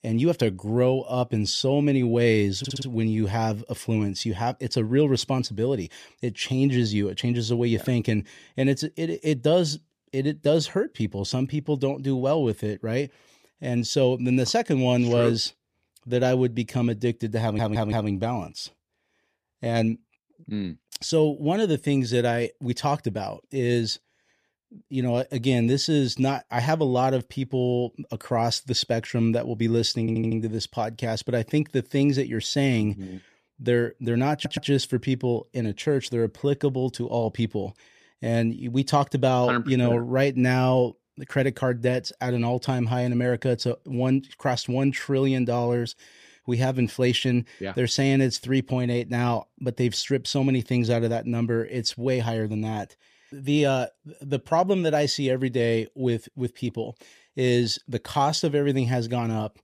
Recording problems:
audio stuttering; 4 times, first at 2.5 s

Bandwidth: 14.5 kHz